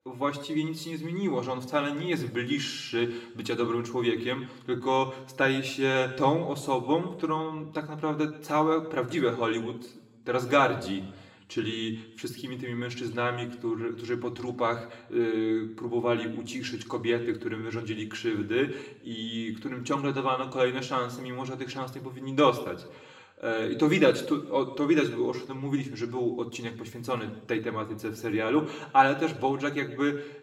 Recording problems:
room echo; slight; dies away in 0.7 s
off-mic speech; somewhat distant

